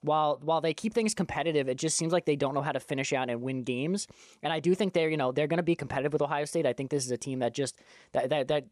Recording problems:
none

